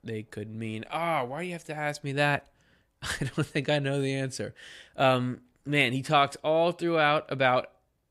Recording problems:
none

